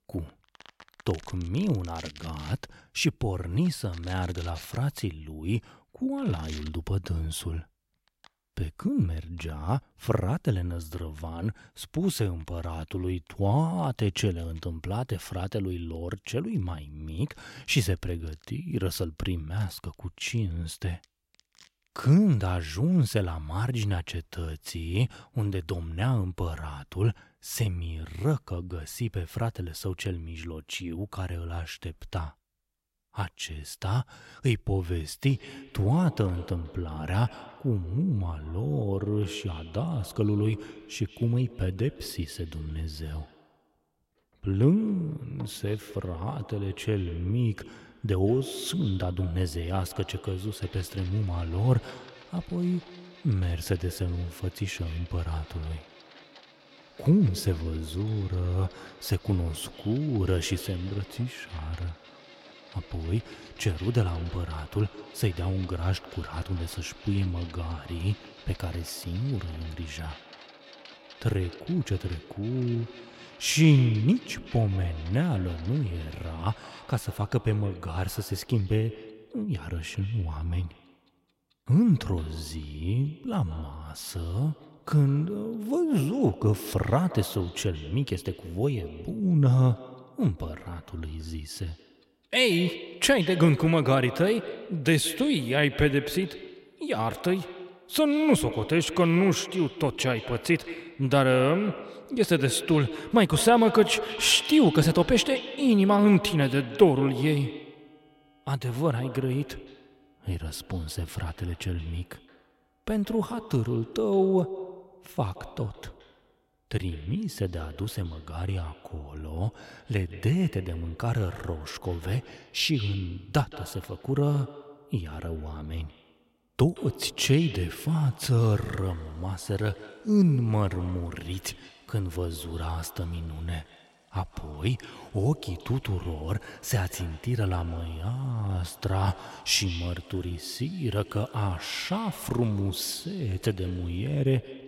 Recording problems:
echo of what is said; noticeable; from 35 s on; 170 ms later, 15 dB below the speech
household noises; faint; throughout; 25 dB below the speech

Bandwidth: 16 kHz